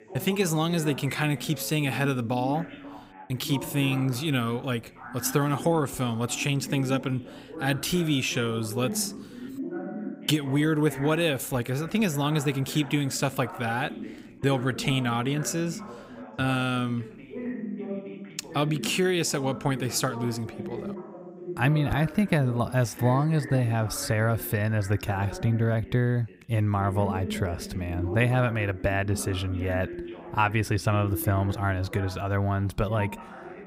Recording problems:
background chatter; noticeable; throughout; 2 voices, 10 dB below the speech

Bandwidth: 15.5 kHz